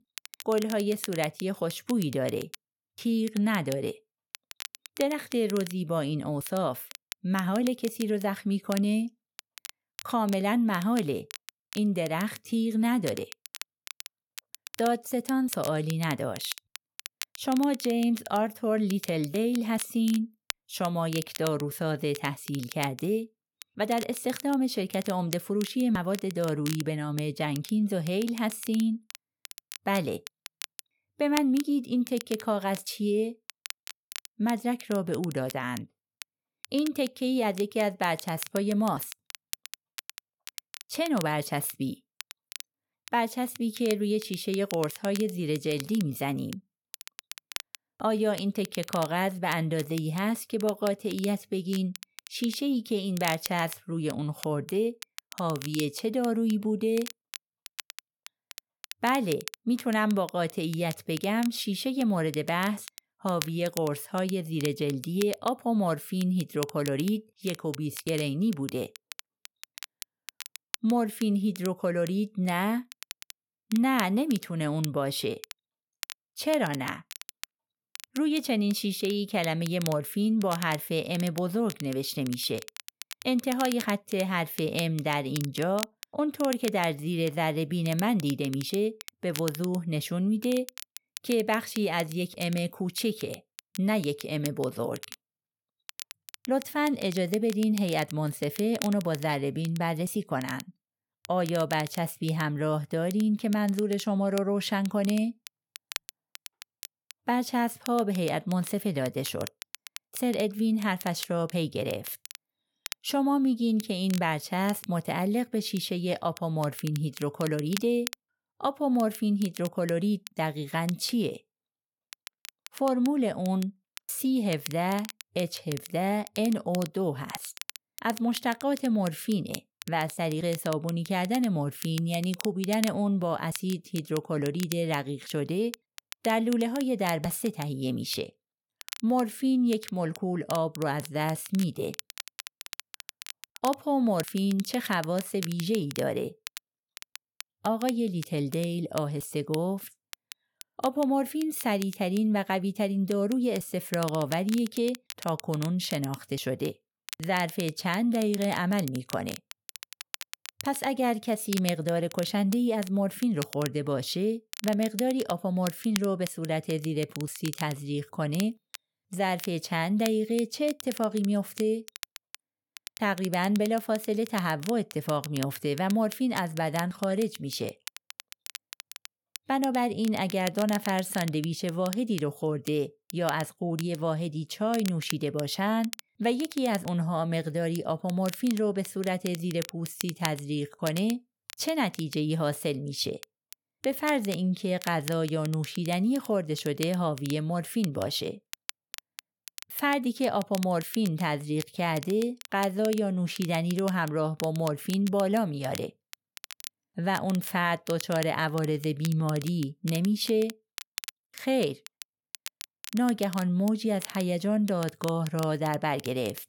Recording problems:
crackle, like an old record; noticeable; 15 dB below the speech

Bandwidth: 17.5 kHz